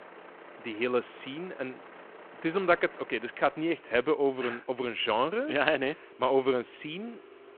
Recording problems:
phone-call audio
traffic noise; faint; throughout; 20 dB below the speech

